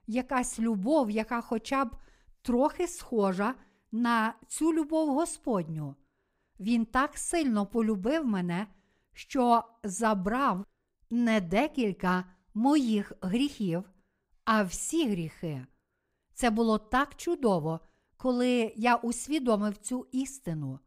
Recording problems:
none

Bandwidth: 15.5 kHz